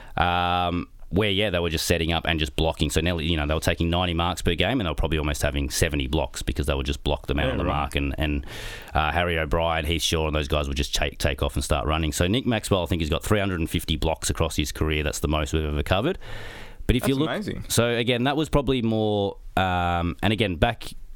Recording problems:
squashed, flat; heavily

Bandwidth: 18 kHz